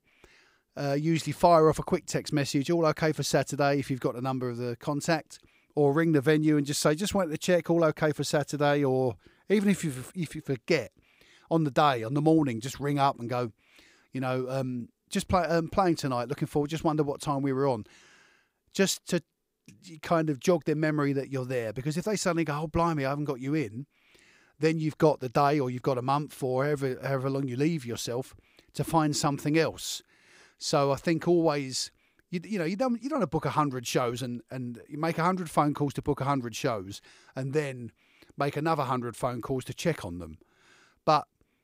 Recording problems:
none

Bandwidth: 15.5 kHz